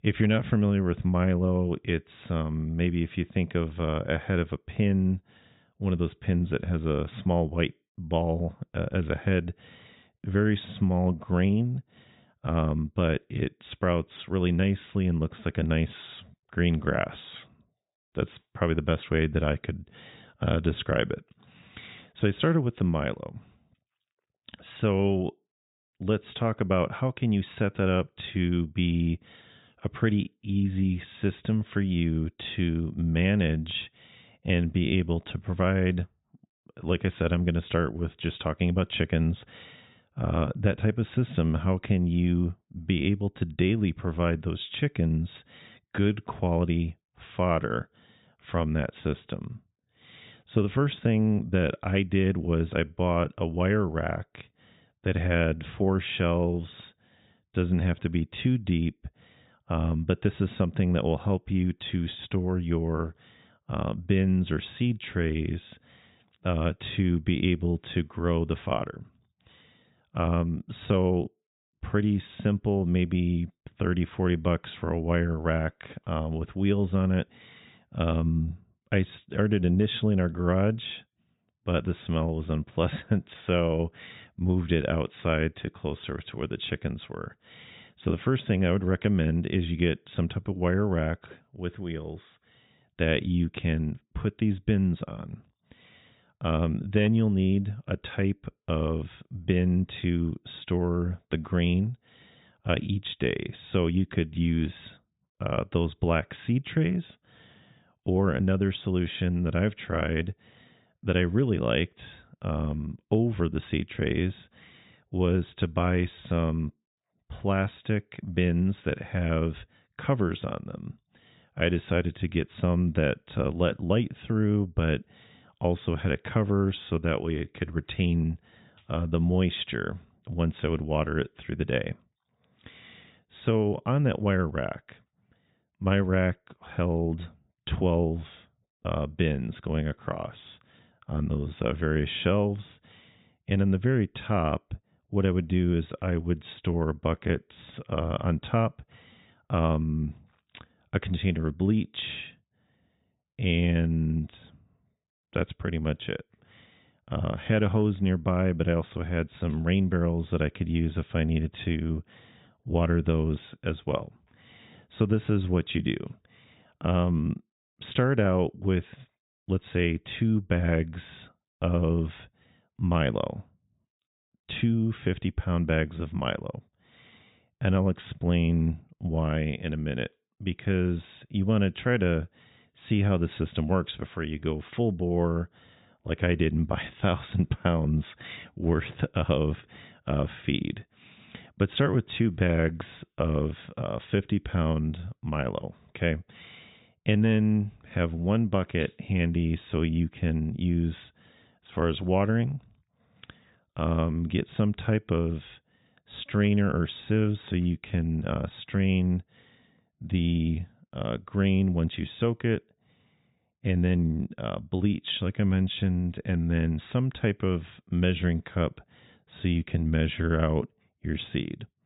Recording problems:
high frequencies cut off; severe; nothing above 4 kHz

